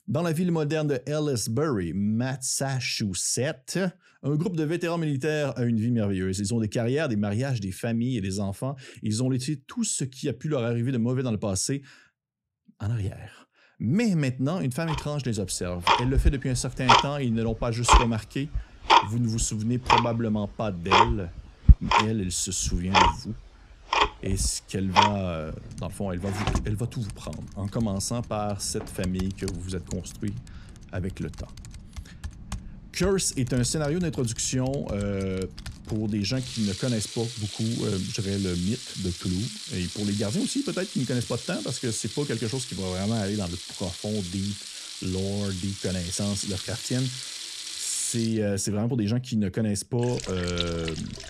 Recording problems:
household noises; very loud; from 15 s on; as loud as the speech

